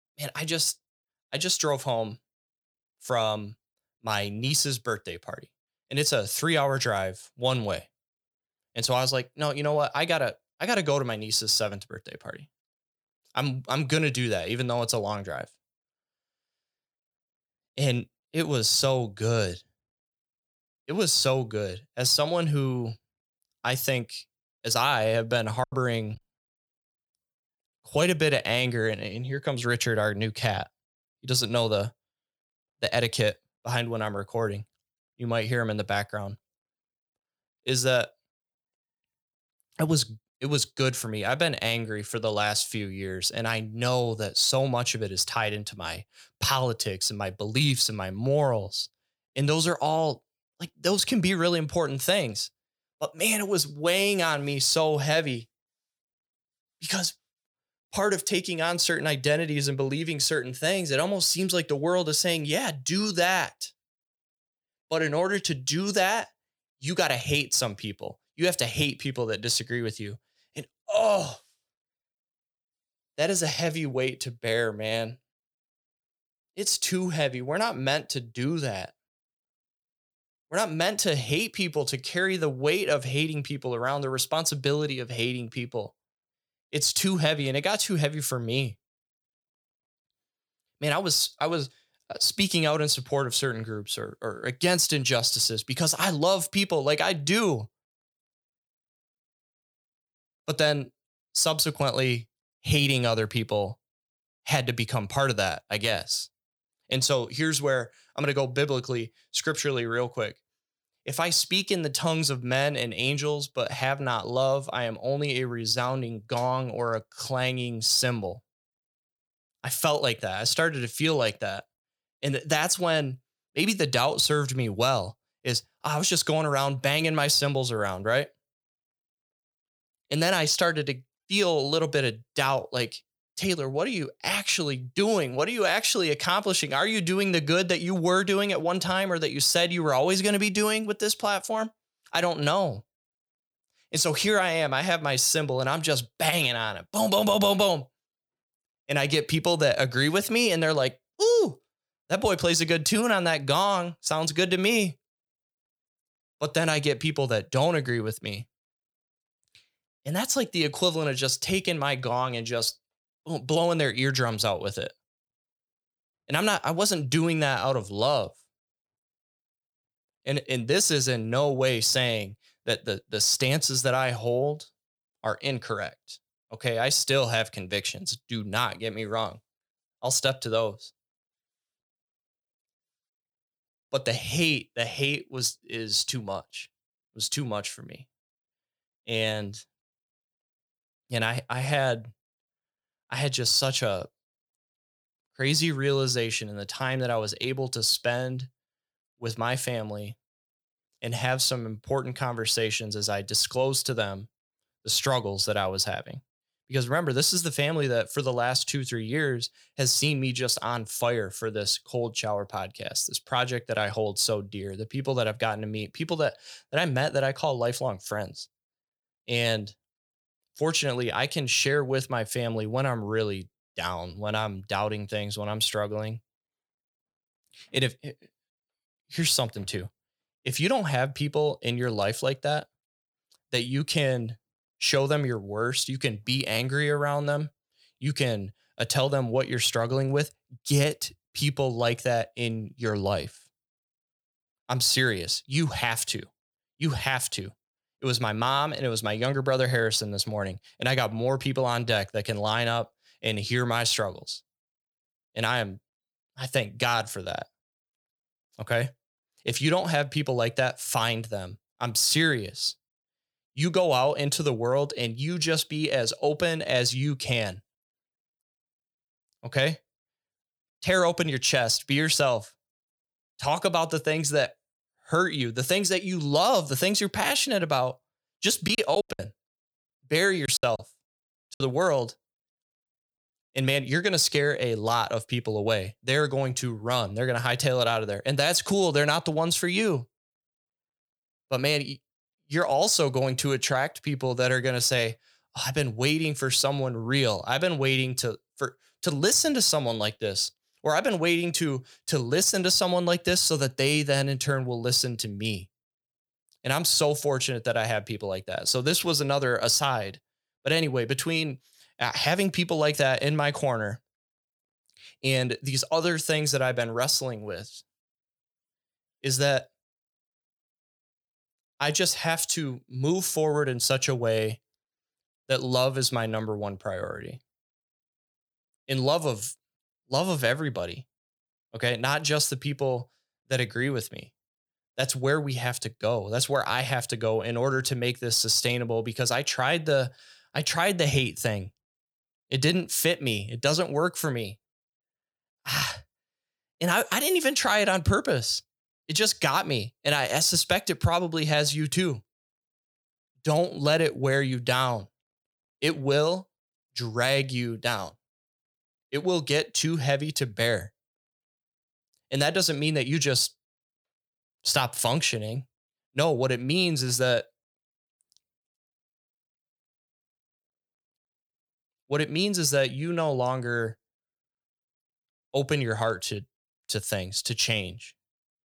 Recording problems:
choppy; very; at 26 s and from 4:39 to 4:42; 16% of the speech affected

